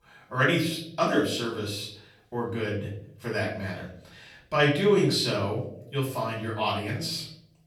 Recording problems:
off-mic speech; far
room echo; noticeable; dies away in 0.6 s

